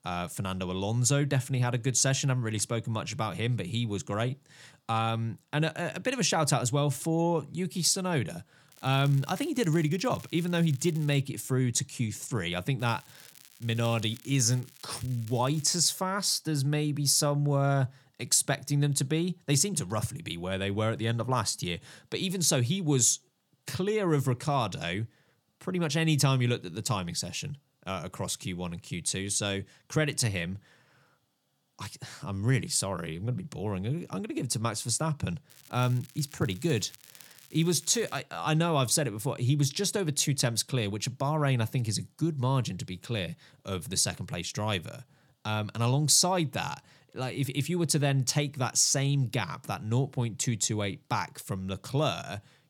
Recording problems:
crackling; faint; from 8.5 to 11 s, from 13 to 16 s and from 35 to 38 s; 20 dB below the speech

